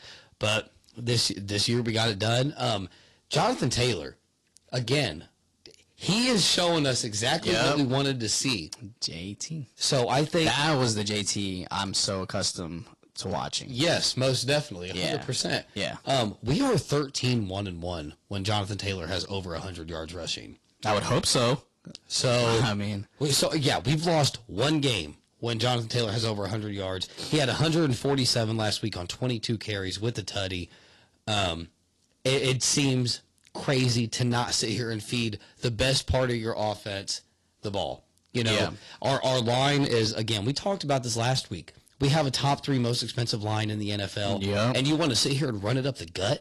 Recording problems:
distortion; slight; 6% of the sound clipped
garbled, watery; slightly; nothing above 11.5 kHz

